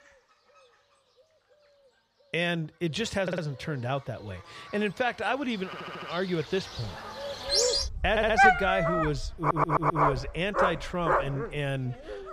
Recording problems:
animal sounds; very loud; throughout; 3 dB above the speech
audio stuttering; 4 times, first at 3 s

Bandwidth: 14.5 kHz